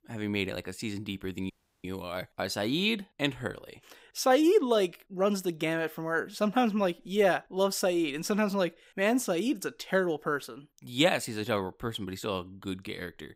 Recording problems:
audio cutting out; at 1.5 s

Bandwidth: 15.5 kHz